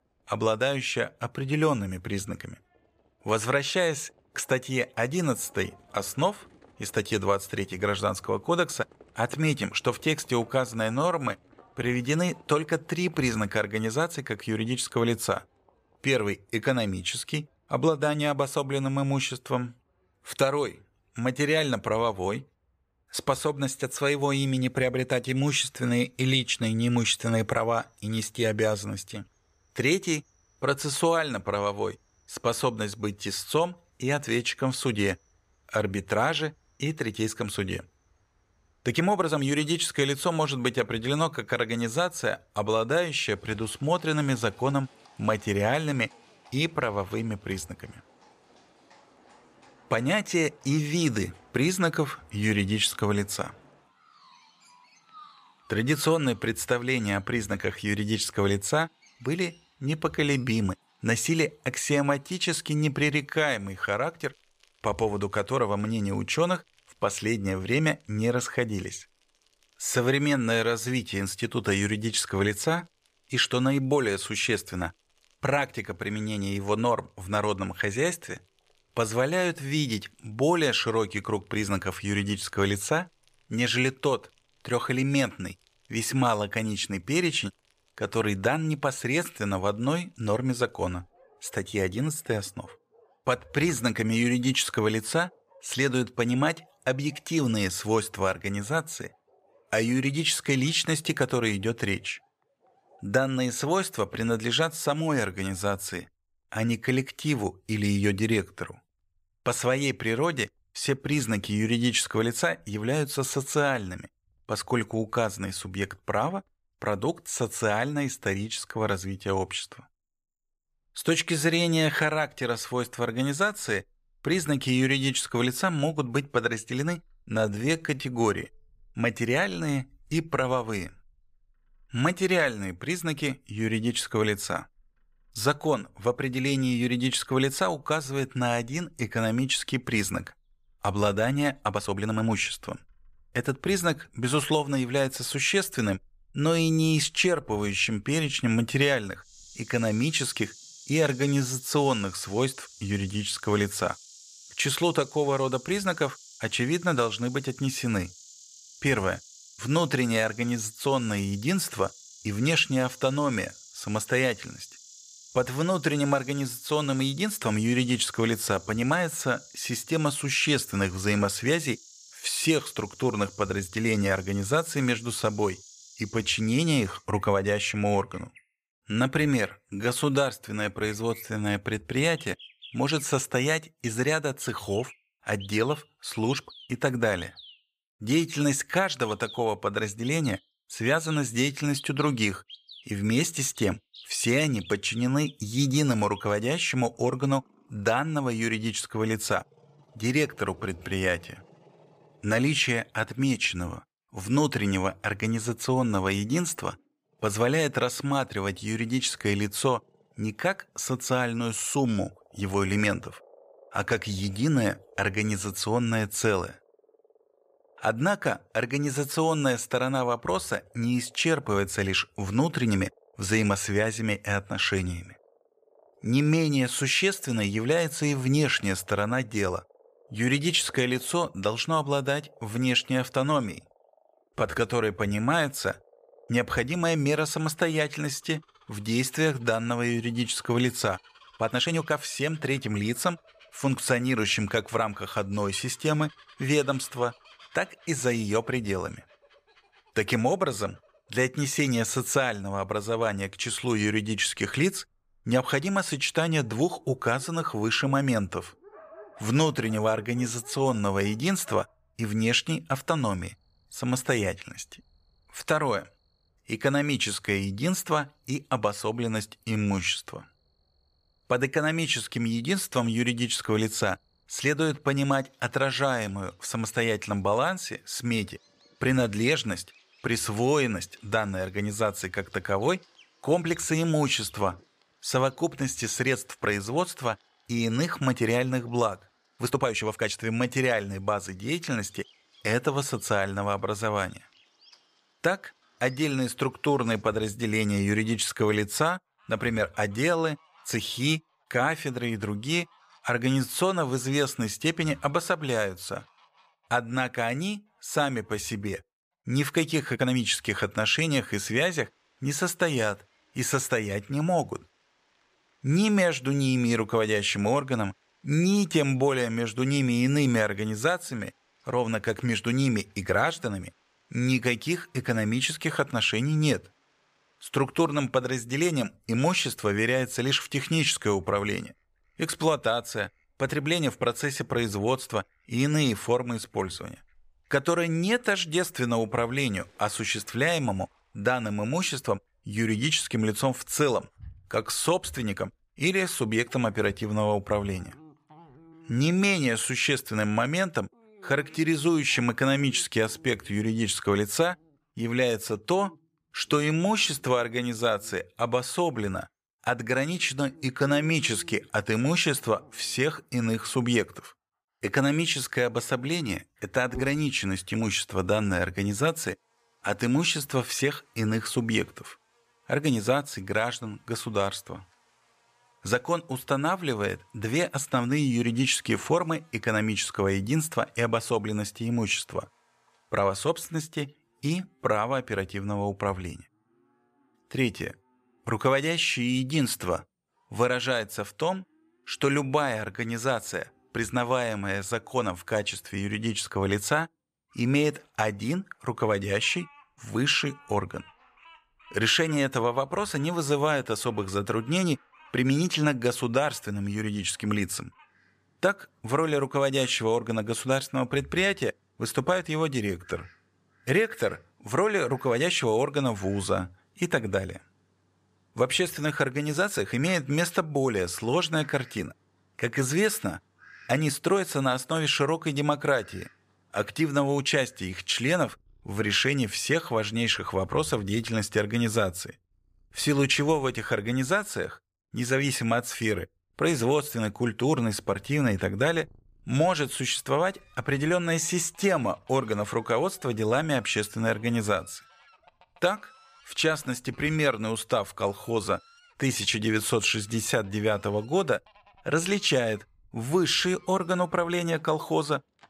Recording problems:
animal sounds; faint; throughout; 25 dB below the speech
uneven, jittery; strongly; from 11 s to 7:00

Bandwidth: 15 kHz